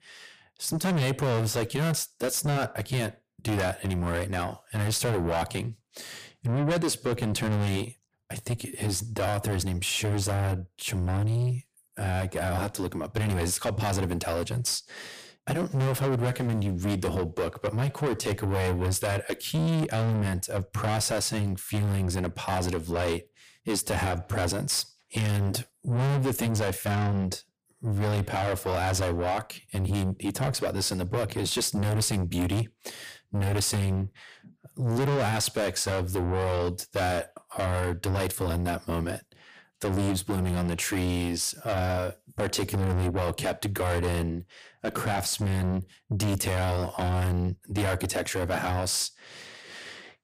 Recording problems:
distortion; heavy; 5 dB below the speech

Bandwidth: 15 kHz